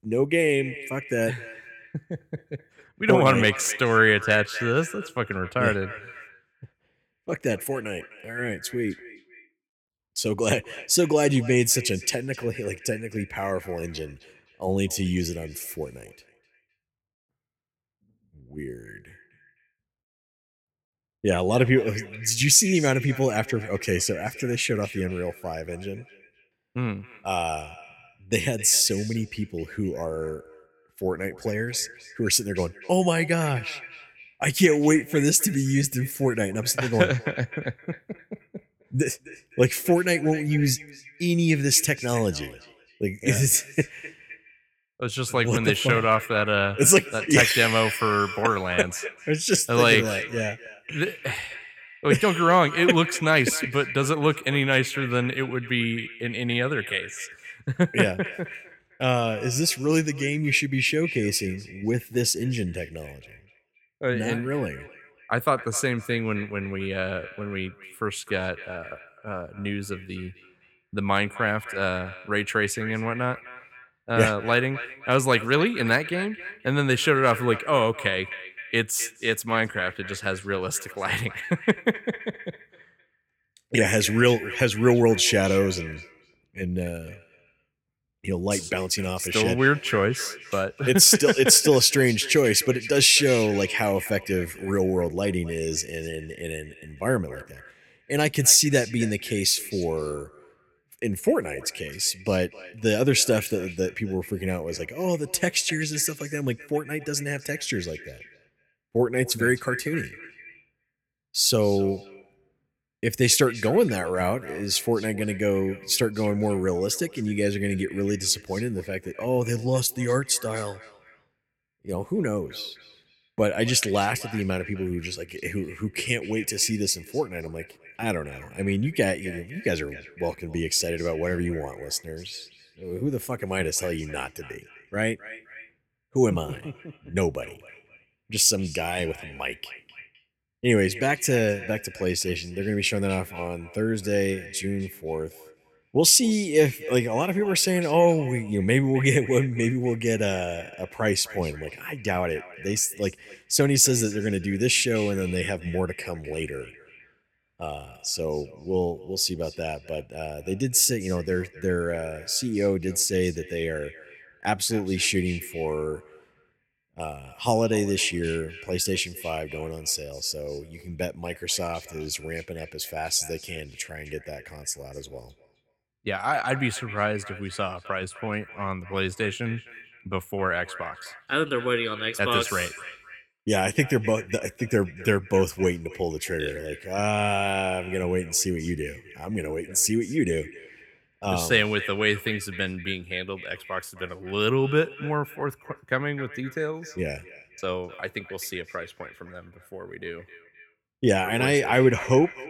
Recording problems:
echo of what is said; noticeable; throughout; 260 ms later, 15 dB below the speech

